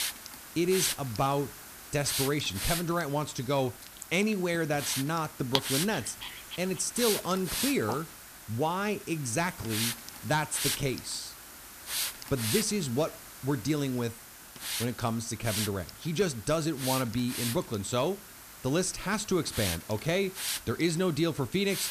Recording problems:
hiss; loud; throughout; 5 dB below the speech
dog barking; noticeable; from 4 to 8 s; peak 1 dB below the speech

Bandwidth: 14.5 kHz